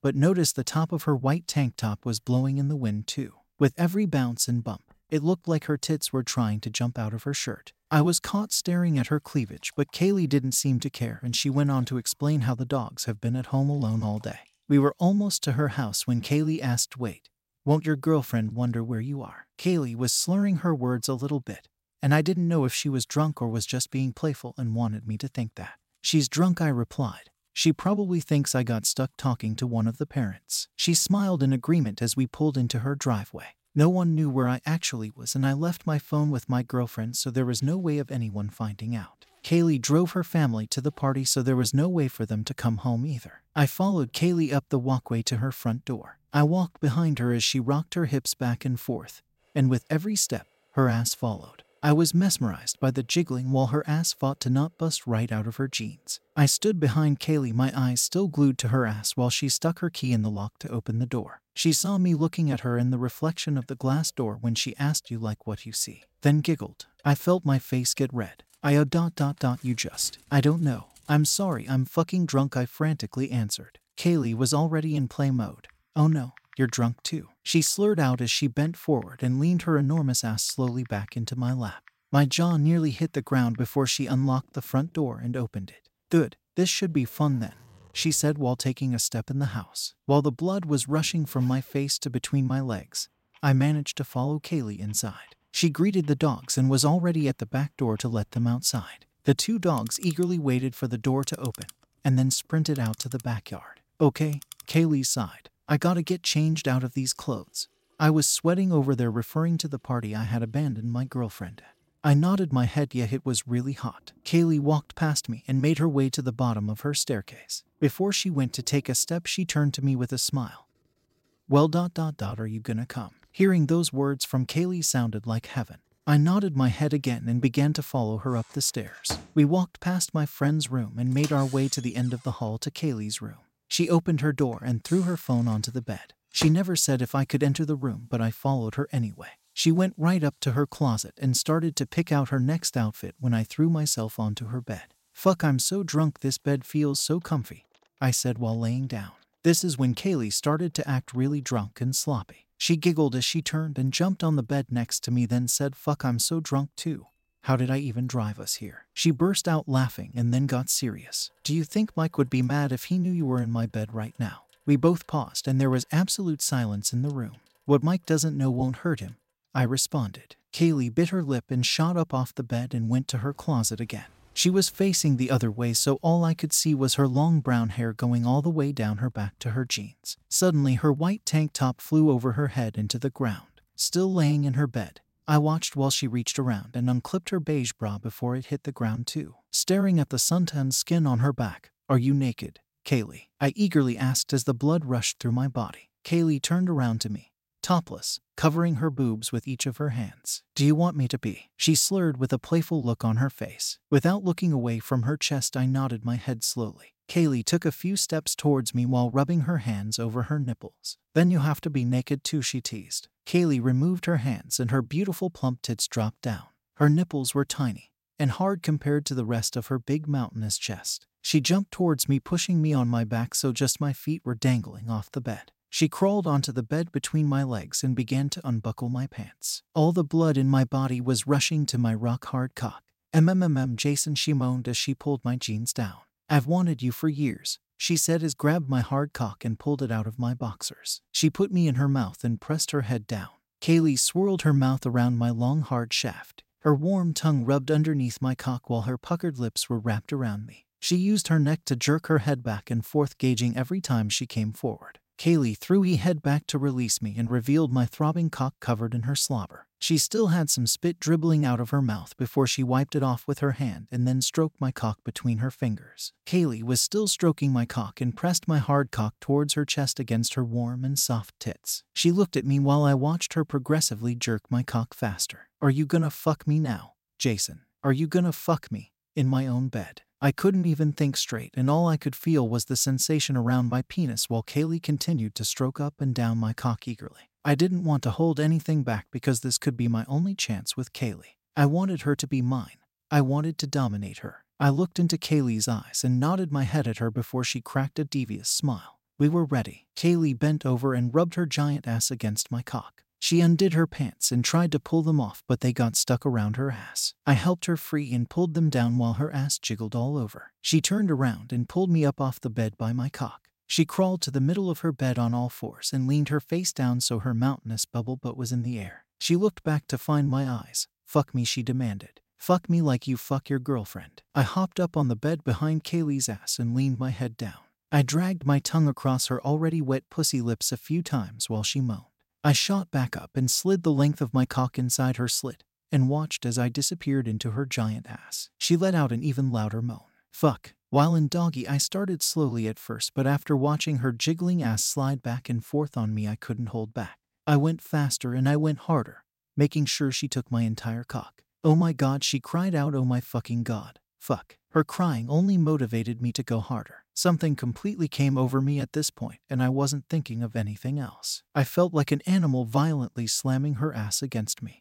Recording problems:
household noises; faint; until 3:06; 25 dB below the speech

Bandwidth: 16 kHz